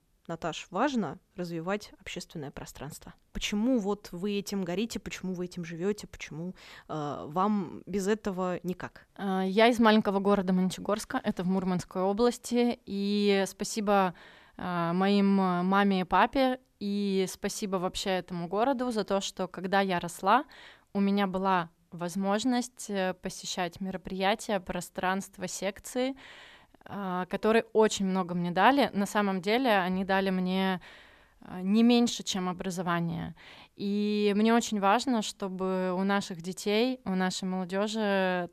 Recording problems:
none

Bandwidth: 14 kHz